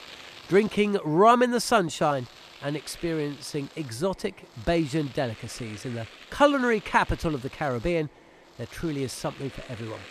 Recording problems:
household noises; faint; throughout; 20 dB below the speech

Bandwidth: 14 kHz